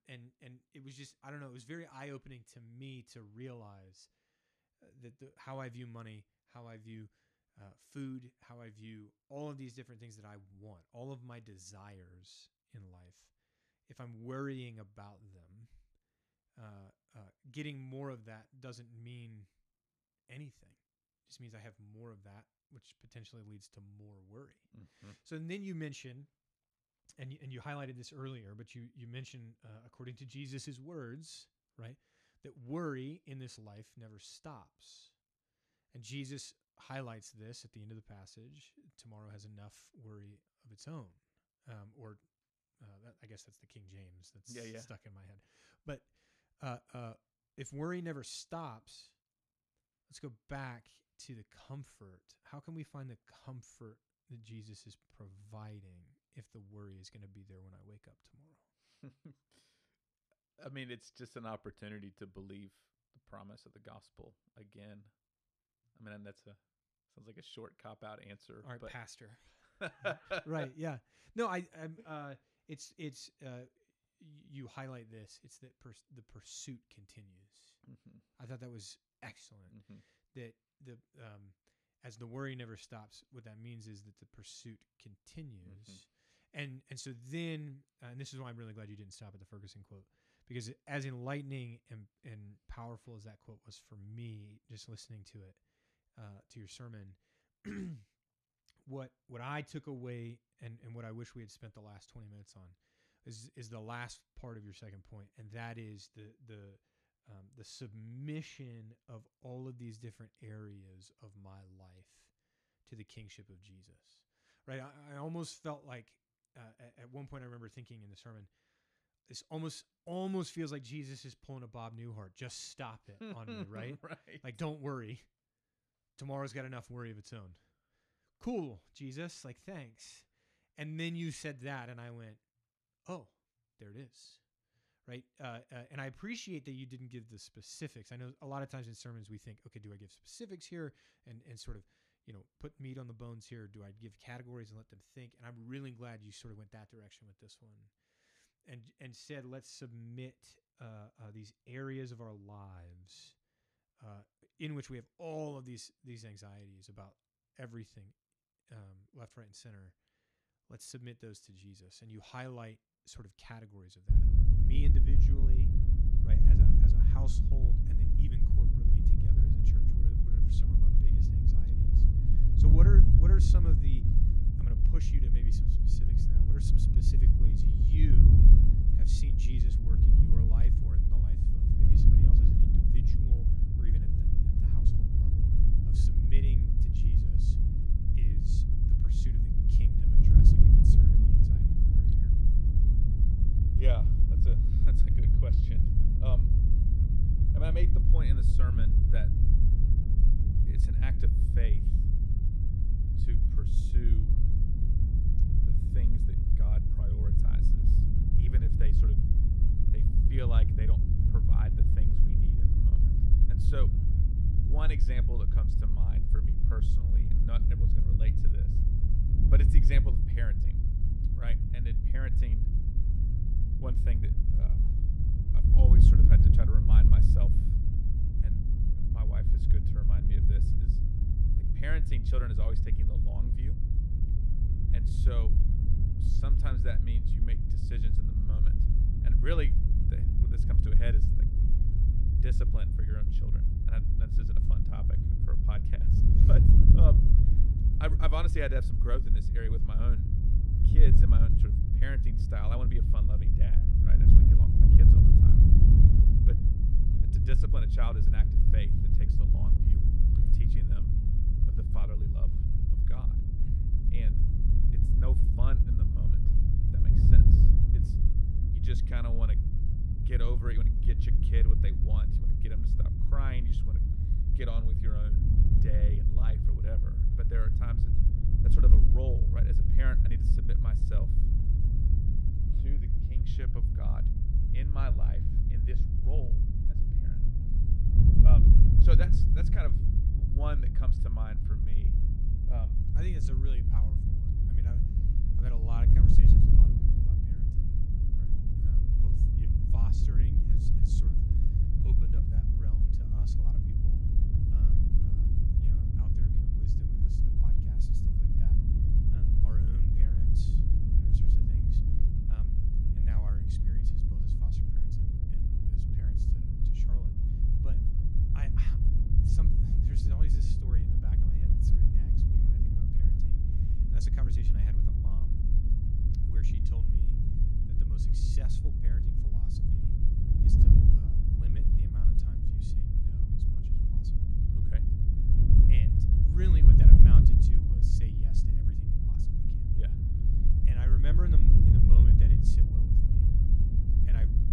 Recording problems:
wind noise on the microphone; heavy; from 2:44 on; 3 dB above the speech

